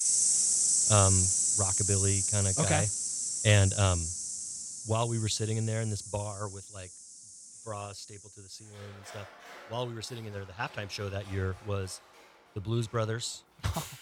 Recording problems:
animal sounds; very loud; throughout; 5 dB above the speech

